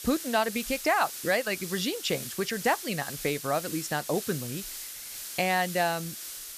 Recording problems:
hiss; loud; throughout; 8 dB below the speech

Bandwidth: 14.5 kHz